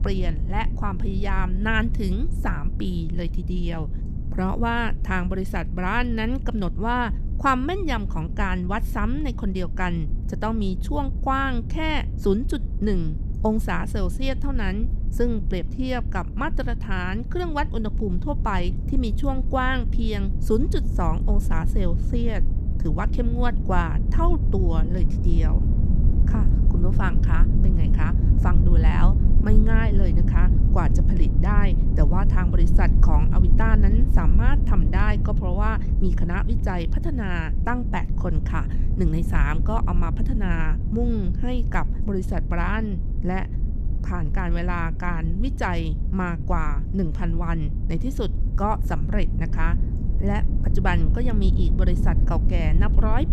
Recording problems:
low rumble; noticeable; throughout; 10 dB below the speech

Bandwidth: 14 kHz